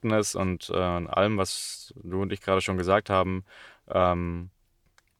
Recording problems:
none

